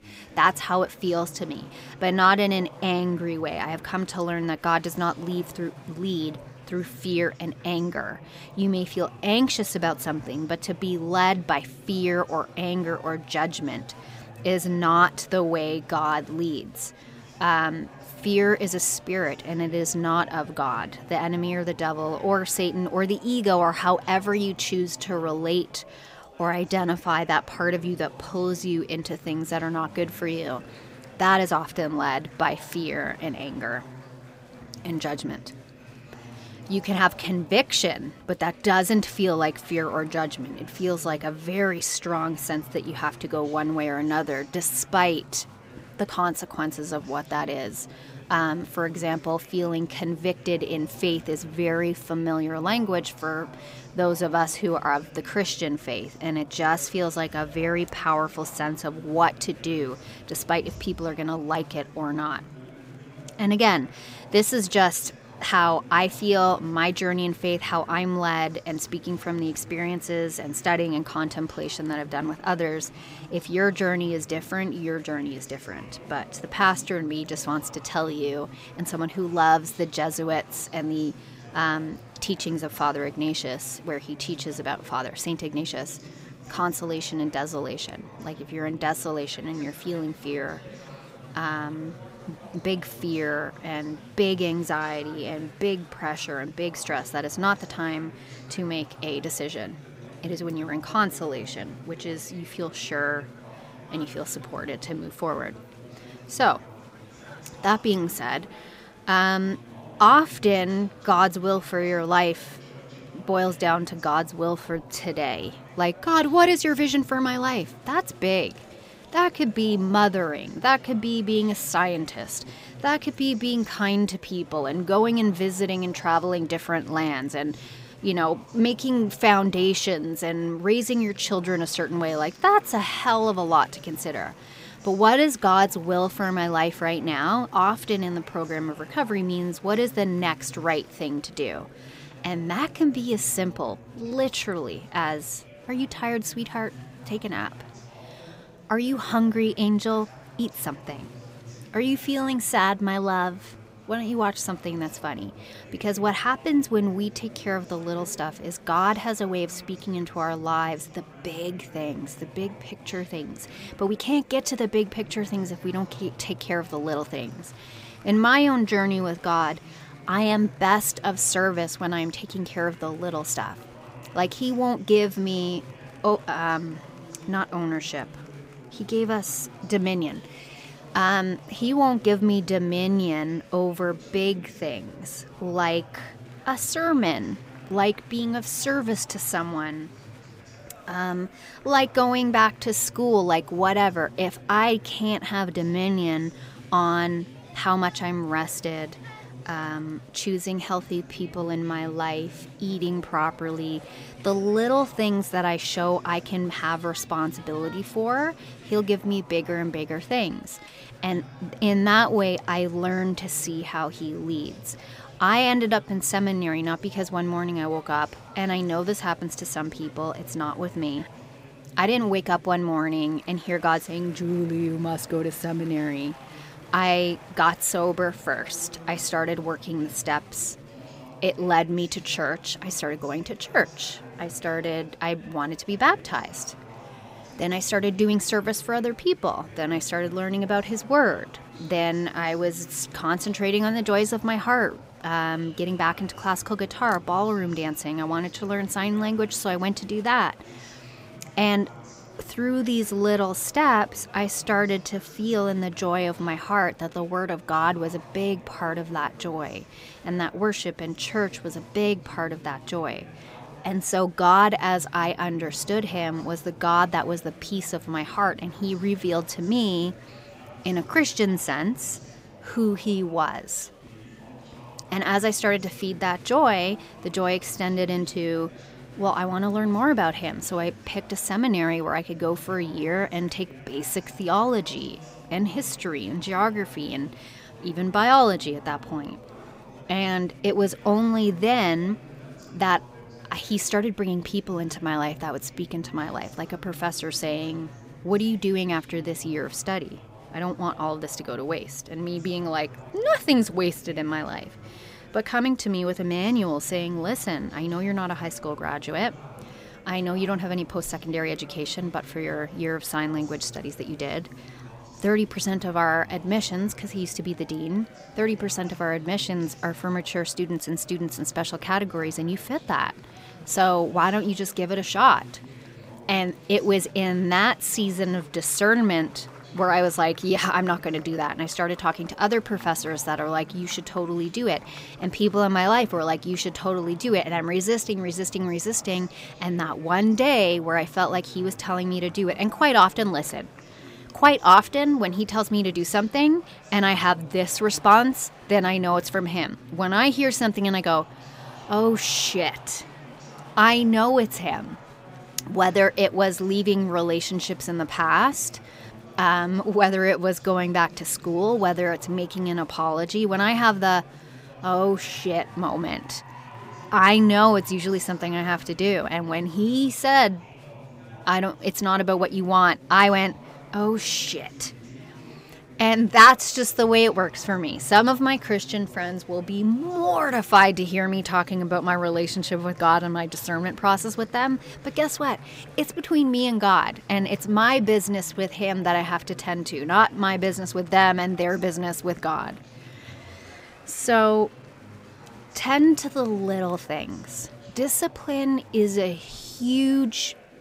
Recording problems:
chatter from many people; faint; throughout; 20 dB below the speech

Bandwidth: 15.5 kHz